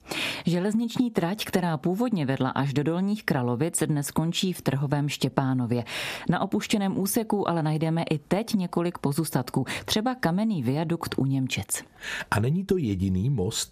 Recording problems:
squashed, flat; heavily

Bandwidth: 14.5 kHz